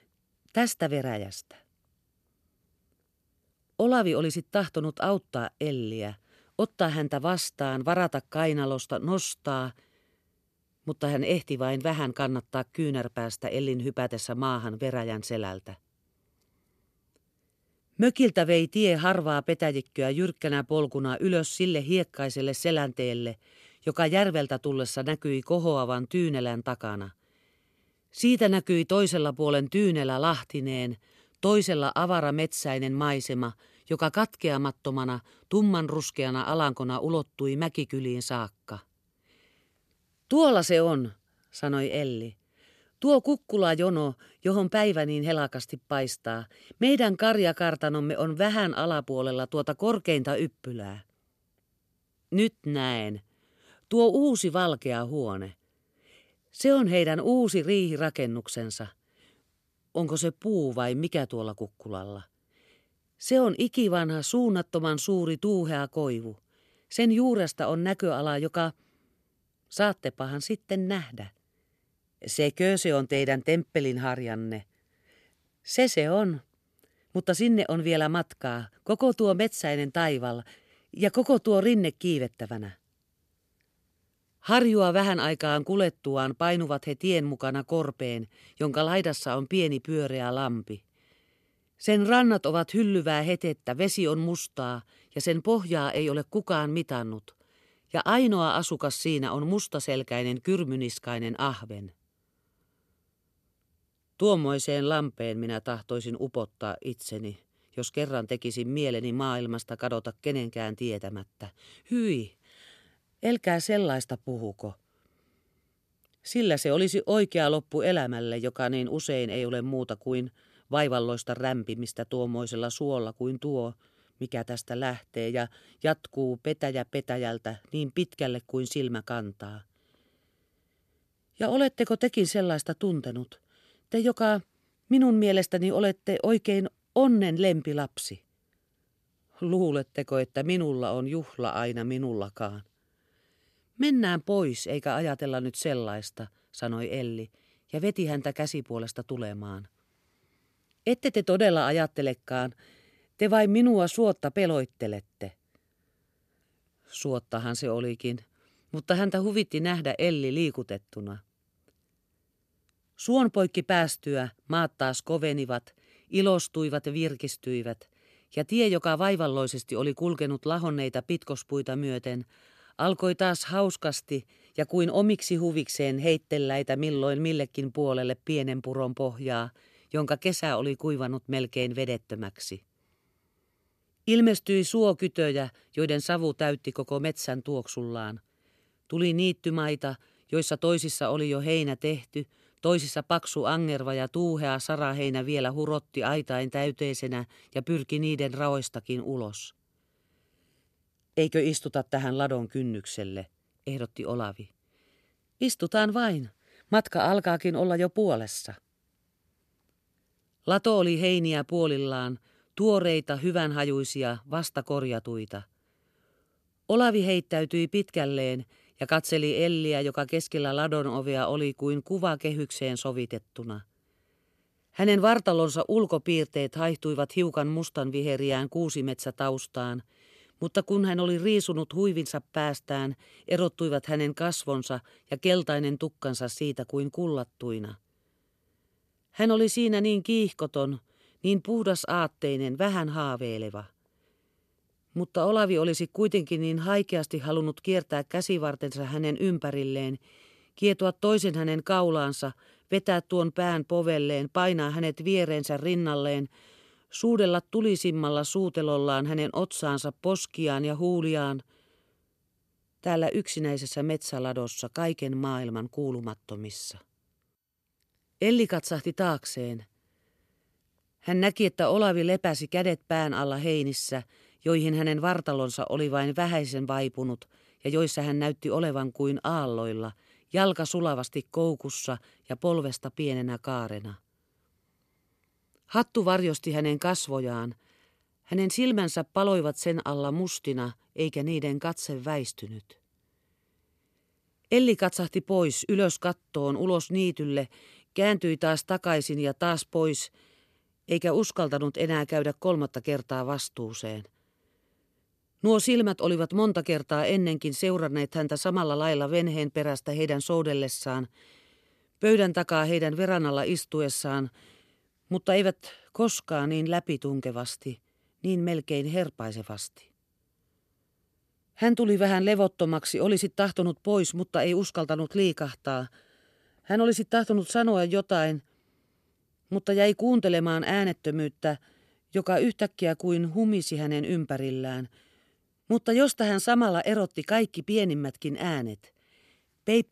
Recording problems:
none

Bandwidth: 13.5 kHz